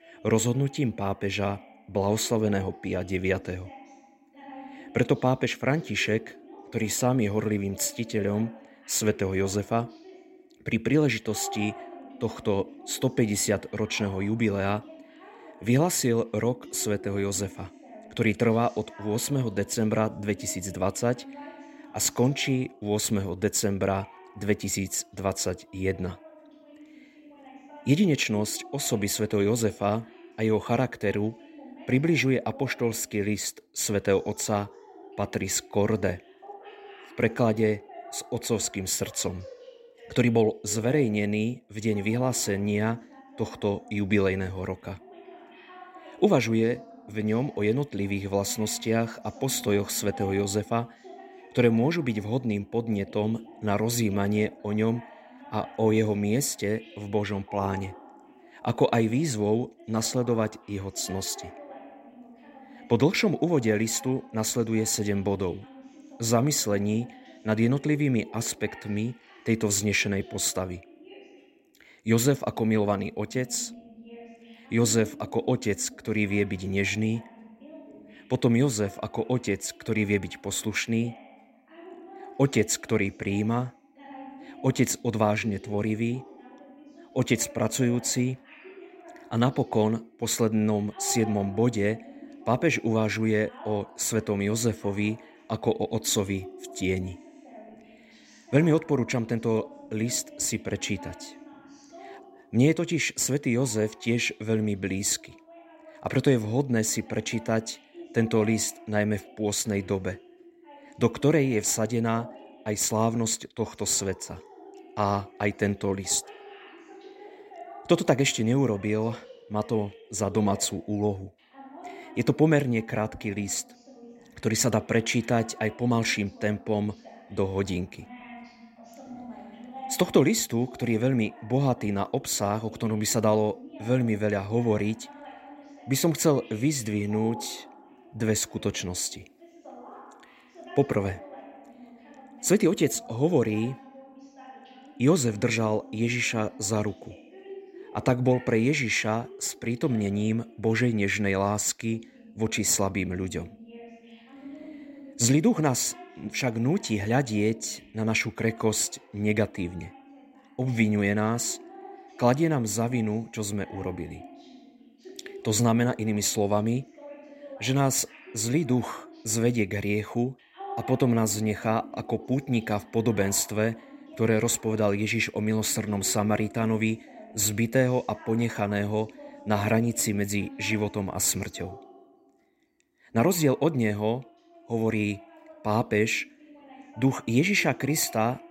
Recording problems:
voice in the background; faint; throughout; 20 dB below the speech

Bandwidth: 16 kHz